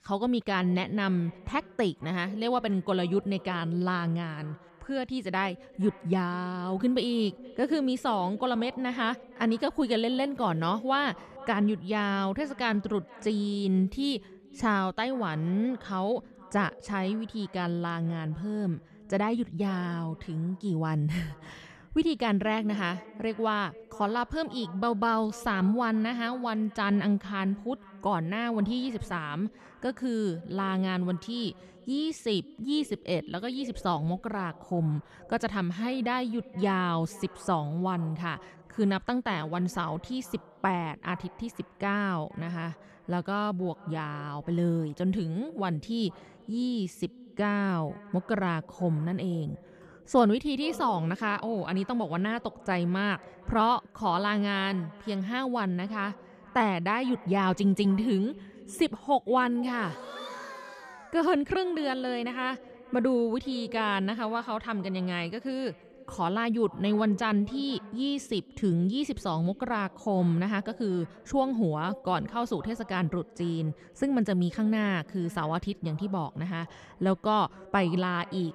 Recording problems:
echo of what is said; faint; throughout; 470 ms later, 20 dB below the speech

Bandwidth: 14 kHz